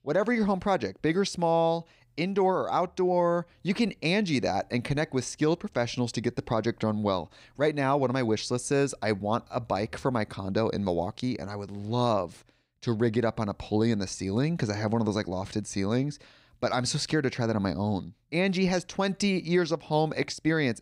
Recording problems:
none

